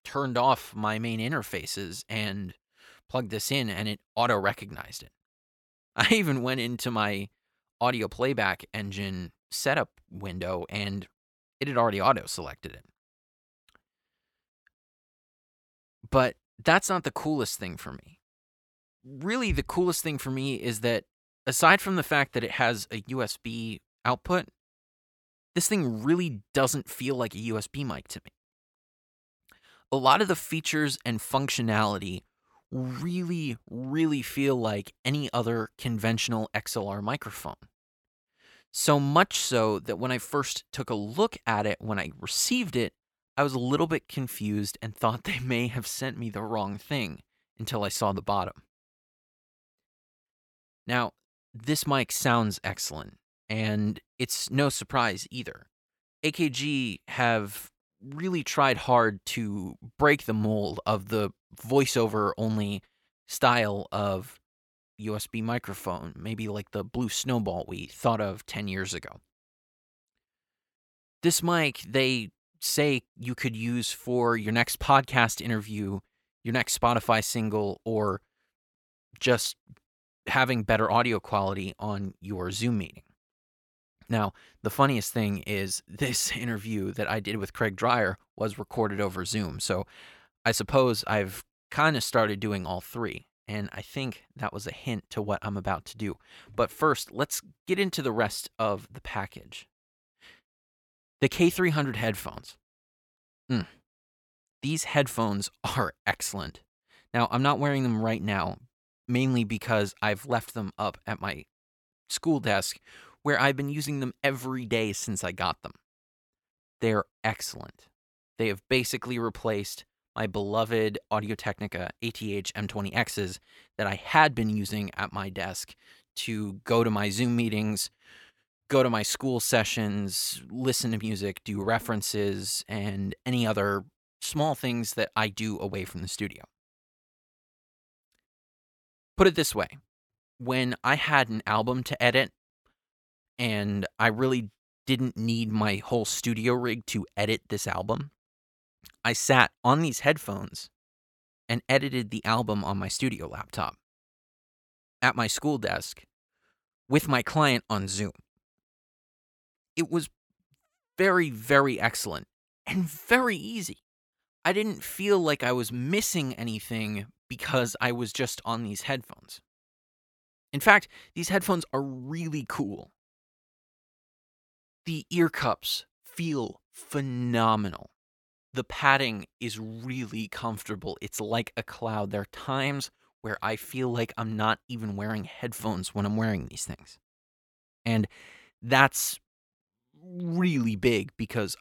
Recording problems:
none

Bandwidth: 18 kHz